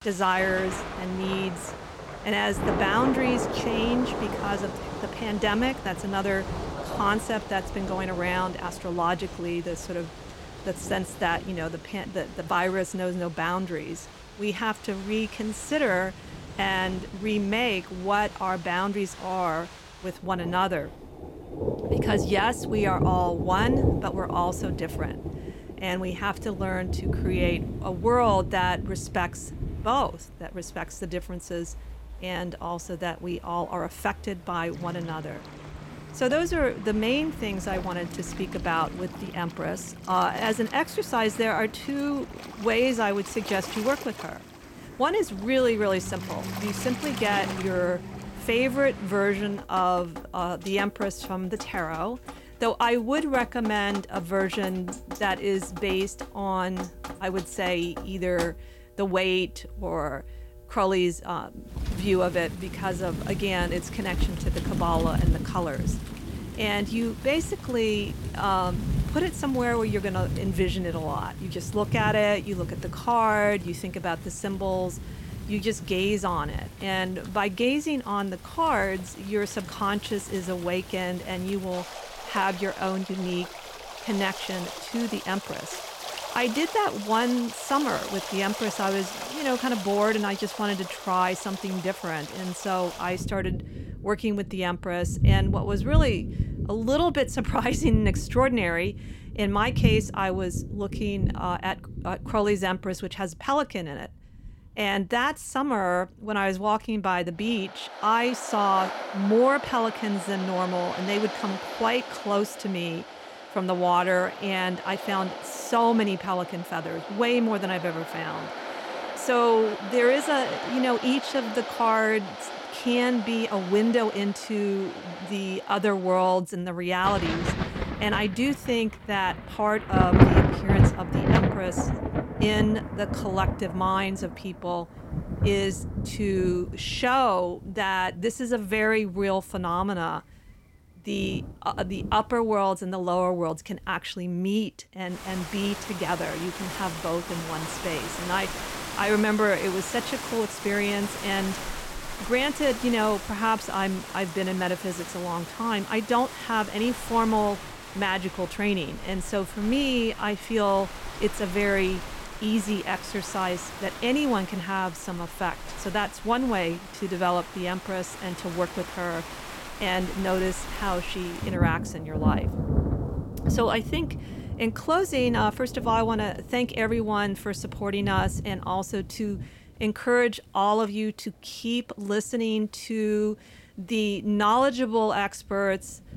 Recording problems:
rain or running water; loud; throughout; 6 dB below the speech

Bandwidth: 16.5 kHz